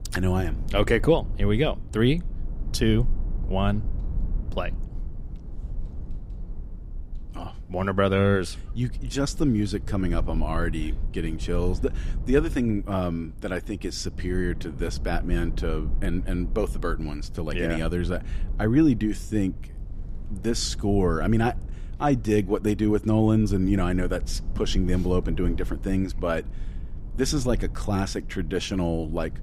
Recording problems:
low rumble; faint; throughout; 20 dB below the speech

